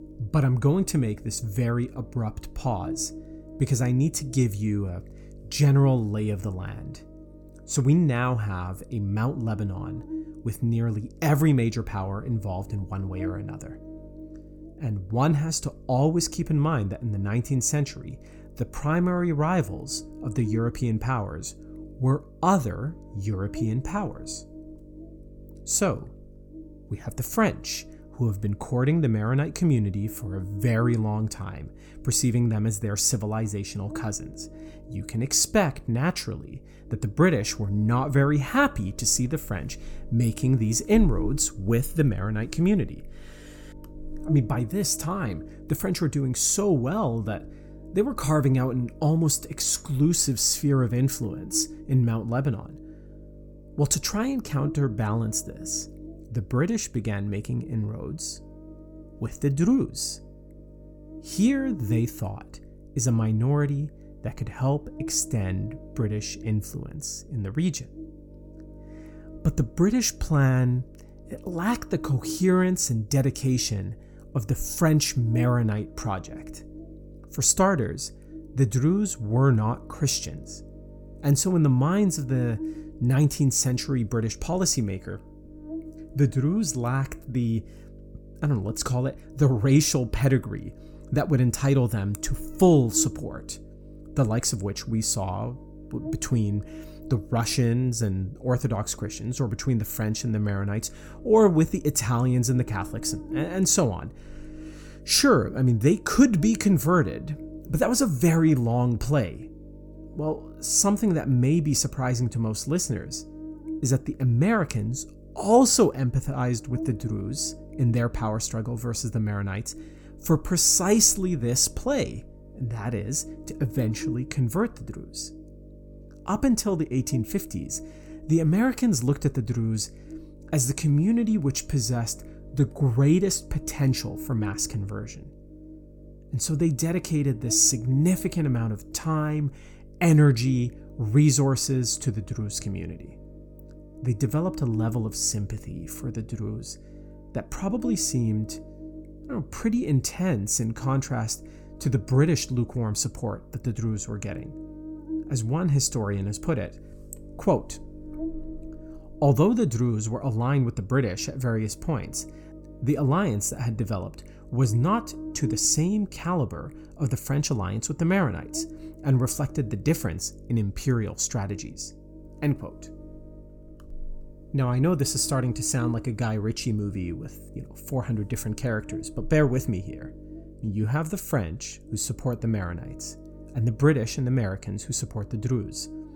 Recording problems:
electrical hum; noticeable; throughout; 50 Hz, 20 dB below the speech

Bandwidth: 18 kHz